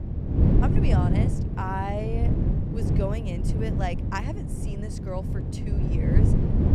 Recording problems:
wind noise on the microphone; heavy; 1 dB below the speech

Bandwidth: 14.5 kHz